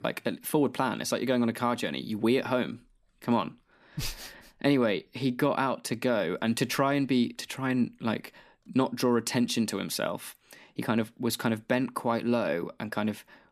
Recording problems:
none

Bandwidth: 14.5 kHz